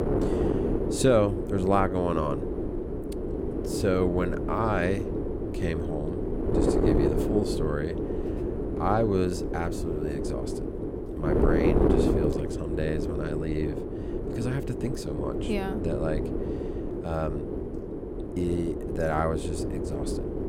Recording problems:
wind noise on the microphone; heavy; 2 dB below the speech

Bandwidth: 16 kHz